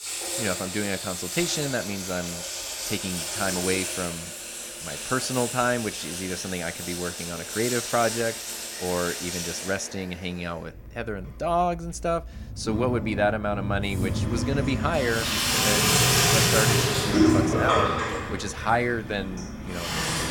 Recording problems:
household noises; very loud; throughout; 3 dB above the speech

